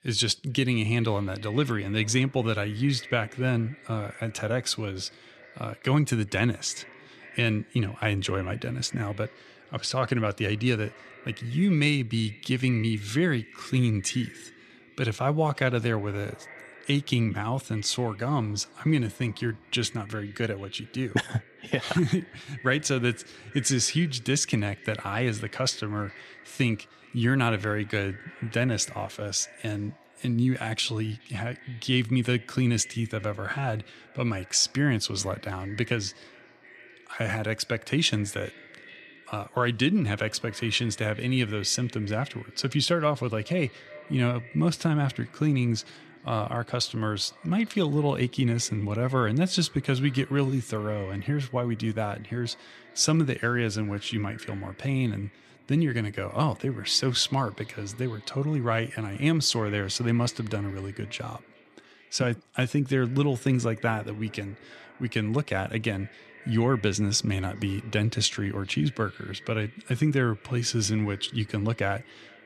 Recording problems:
echo of what is said; faint; throughout; 420 ms later, 20 dB below the speech

